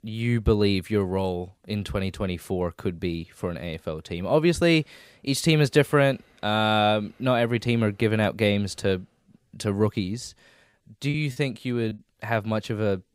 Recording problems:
choppy; very; at 11 s; 17% of the speech affected

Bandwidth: 15.5 kHz